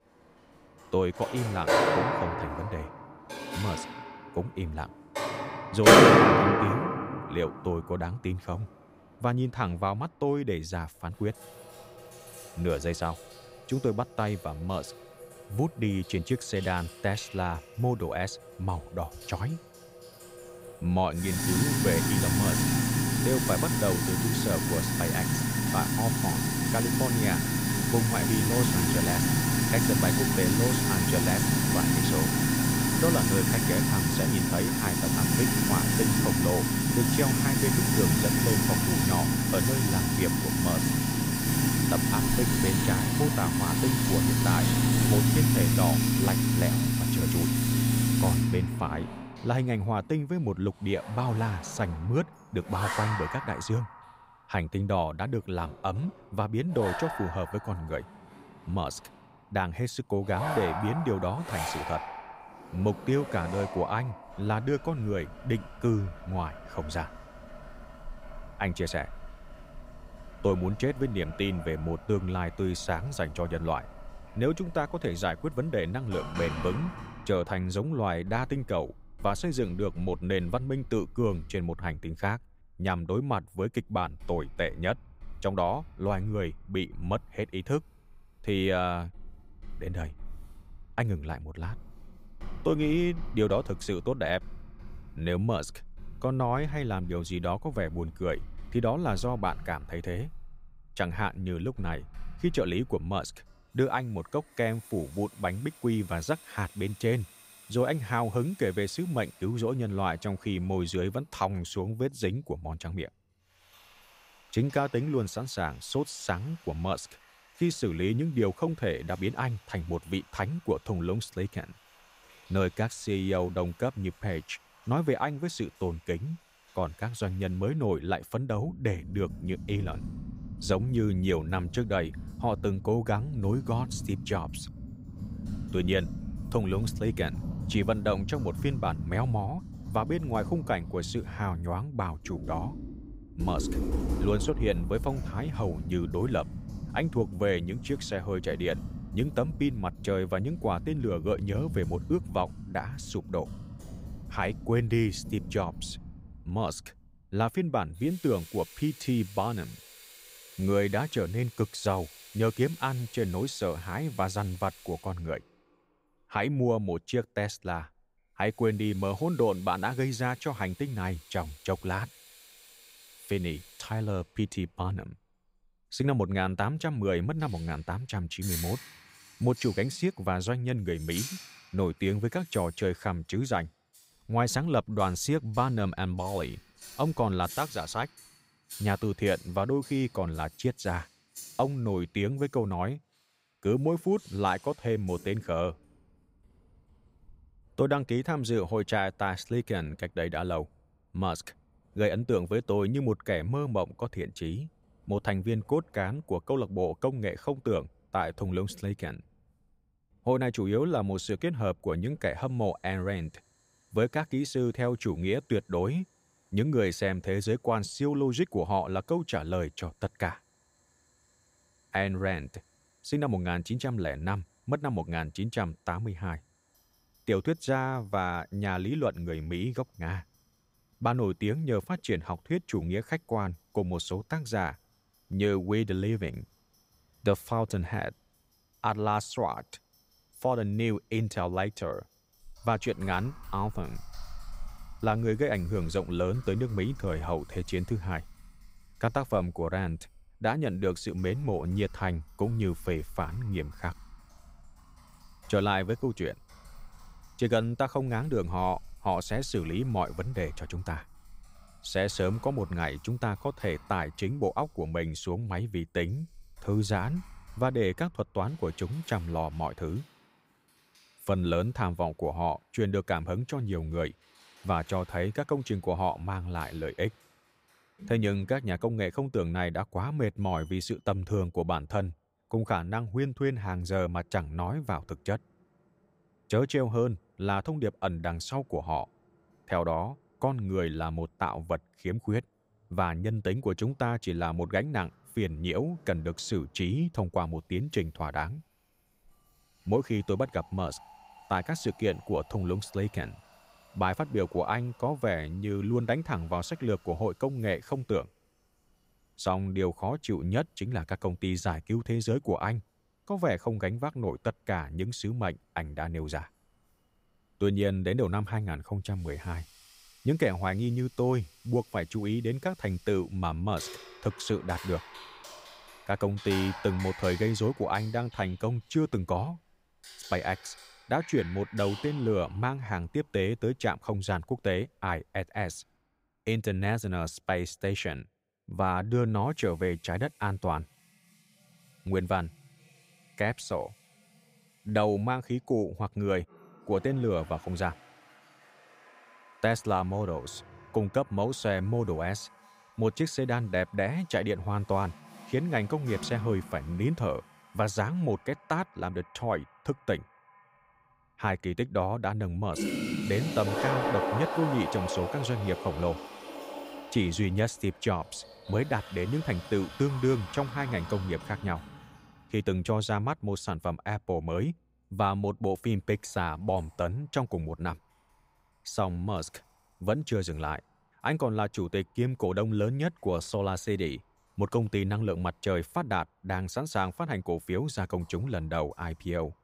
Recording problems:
household noises; very loud; throughout; 2 dB above the speech

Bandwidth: 15.5 kHz